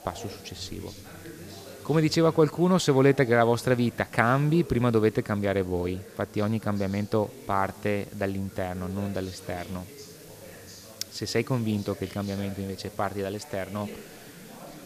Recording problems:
background chatter; noticeable; throughout; 3 voices, 20 dB below the speech
hiss; faint; throughout; 25 dB below the speech

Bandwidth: 14.5 kHz